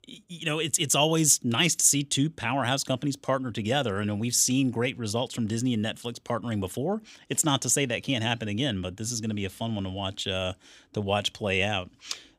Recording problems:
none

